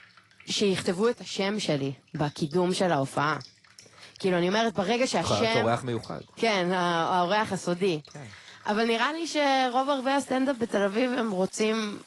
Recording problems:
garbled, watery; slightly; nothing above 10.5 kHz
rain or running water; faint; throughout; 25 dB below the speech

